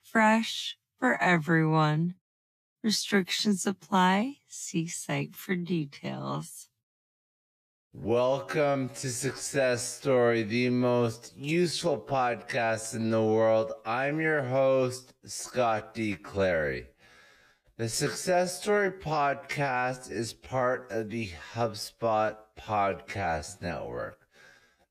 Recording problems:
wrong speed, natural pitch; too slow; 0.5 times normal speed

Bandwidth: 14.5 kHz